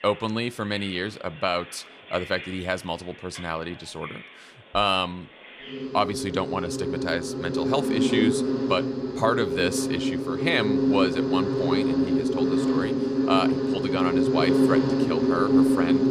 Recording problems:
animal sounds; very loud; throughout; 4 dB above the speech

